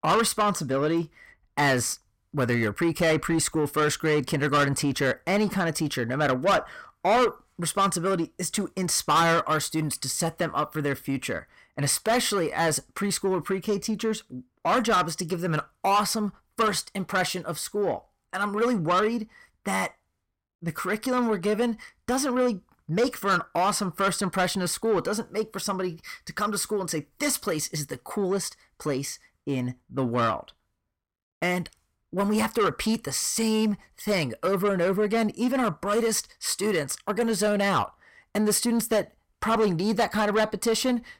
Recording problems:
distortion; heavy; 8 dB below the speech

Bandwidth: 16.5 kHz